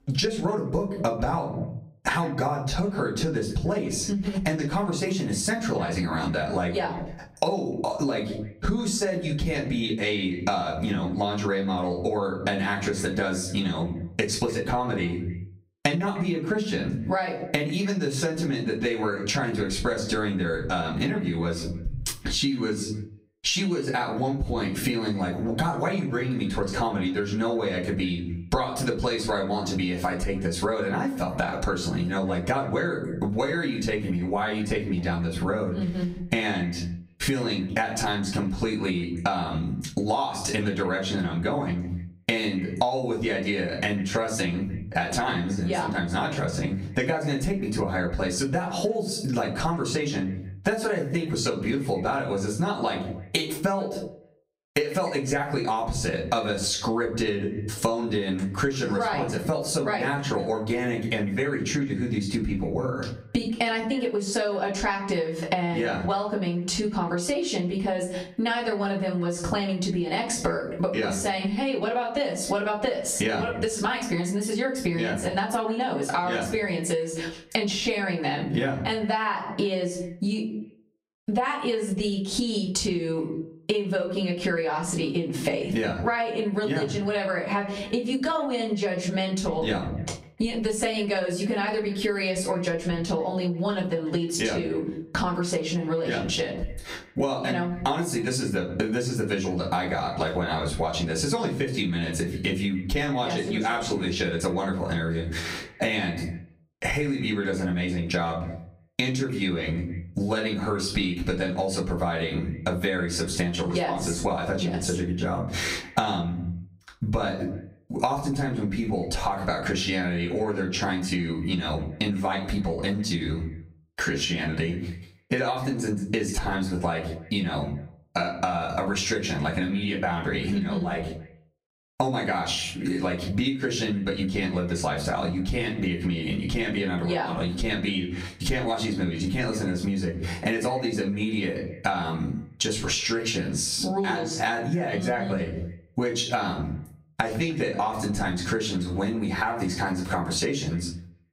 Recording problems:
off-mic speech; far
squashed, flat; heavily
echo of what is said; faint; throughout; 150 ms later, 20 dB below the speech
room echo; slight; dies away in 0.3 s

